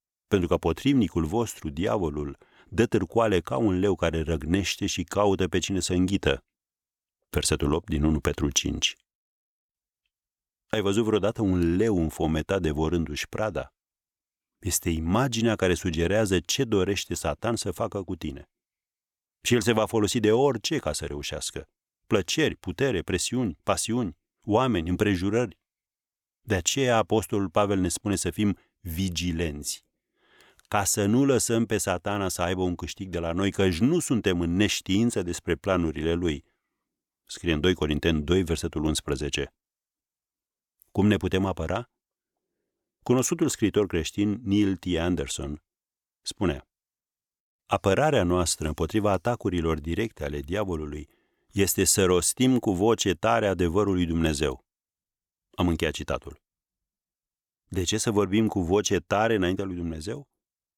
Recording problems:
none

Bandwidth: 18.5 kHz